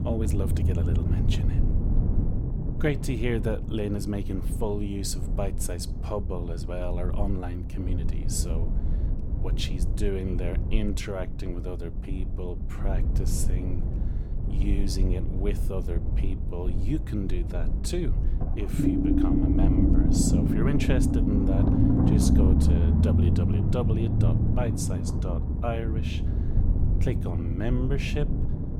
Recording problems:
low rumble; loud; throughout; as loud as the speech

